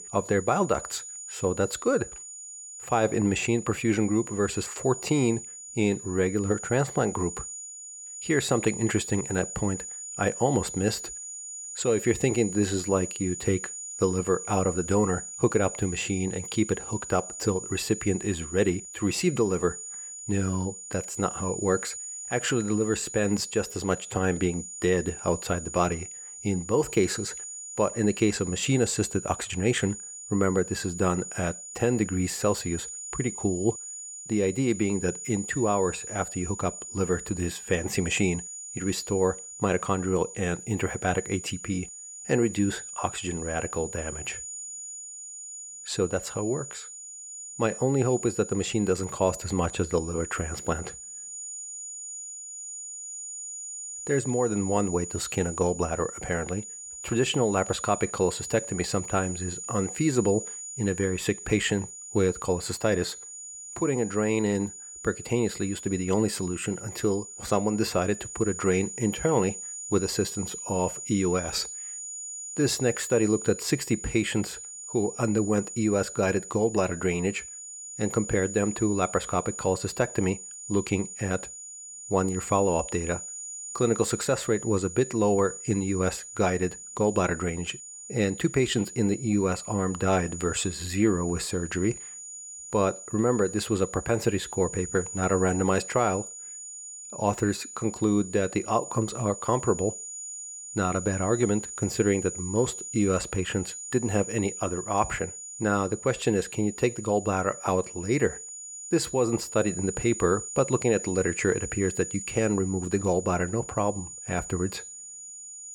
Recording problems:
high-pitched whine; loud; throughout; 7 kHz, 9 dB below the speech

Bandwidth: 18 kHz